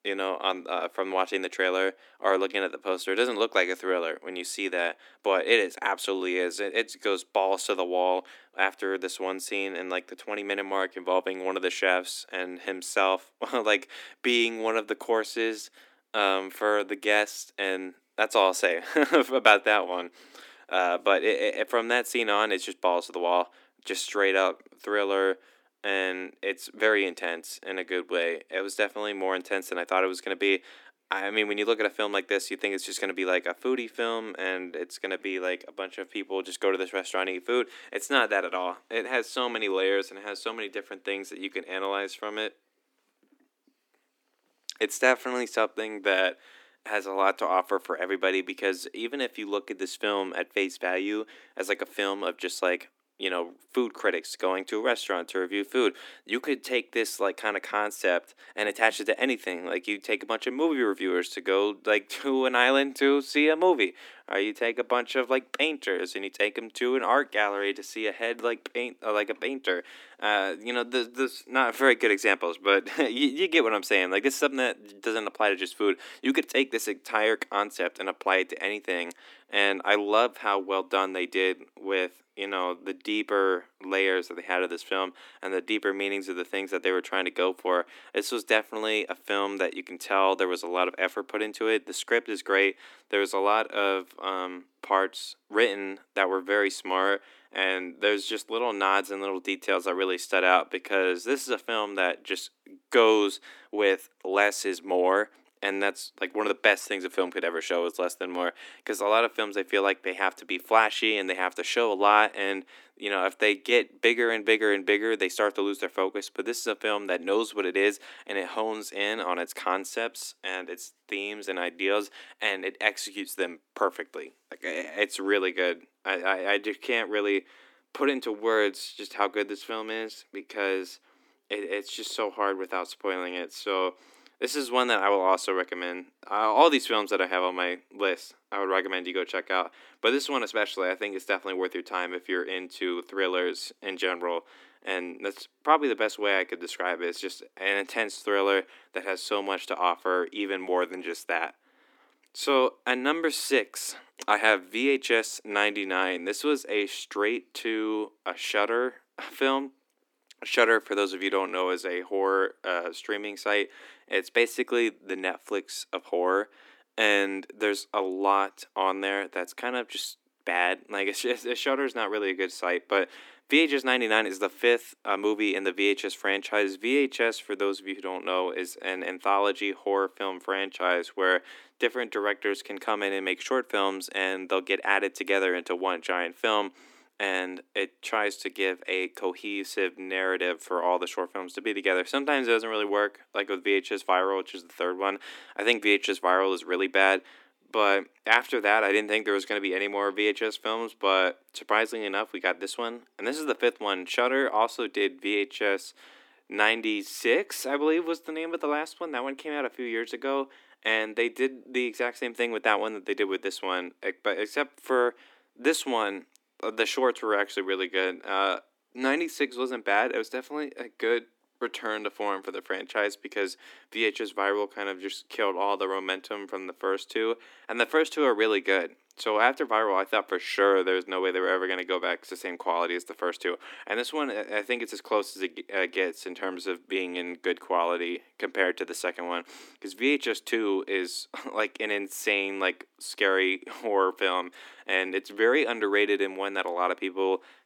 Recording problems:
thin; somewhat; fading below 250 Hz

